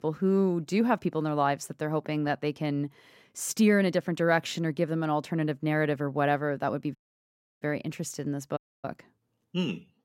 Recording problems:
audio cutting out; at 7 s for 0.5 s and at 8.5 s

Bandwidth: 16 kHz